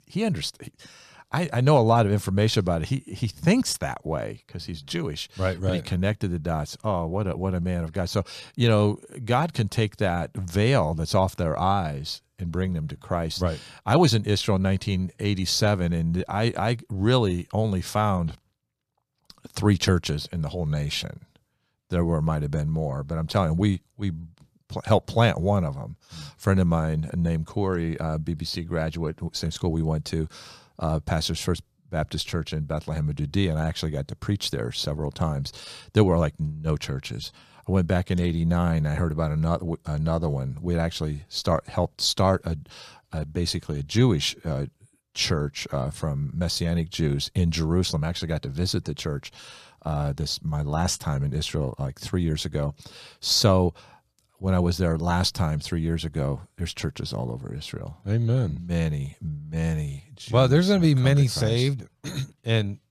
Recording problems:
none

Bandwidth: 14.5 kHz